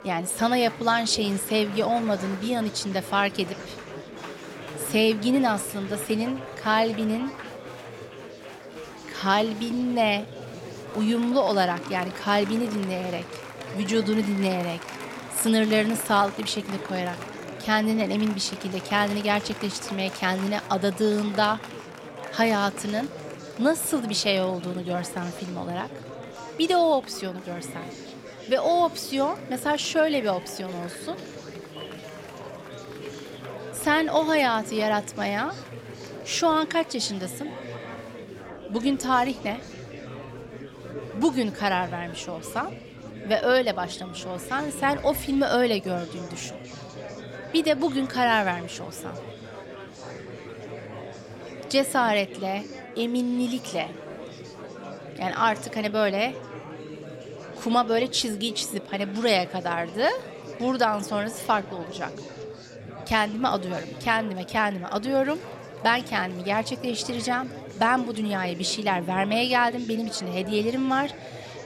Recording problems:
murmuring crowd; noticeable; throughout; 15 dB below the speech

